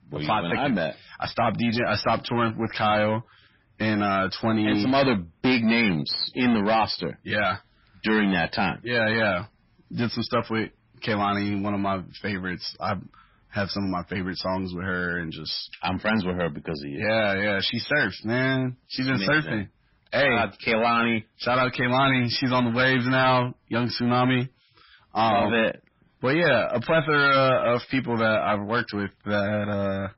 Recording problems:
distortion; heavy; 6 dB below the speech
garbled, watery; badly; nothing above 5.5 kHz

